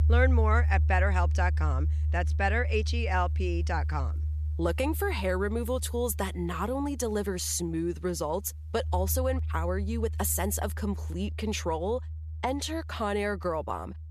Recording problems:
background music; loud; throughout; as loud as the speech

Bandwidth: 14.5 kHz